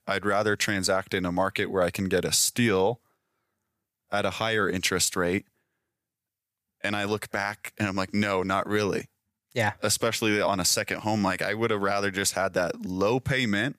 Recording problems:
none

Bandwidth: 15 kHz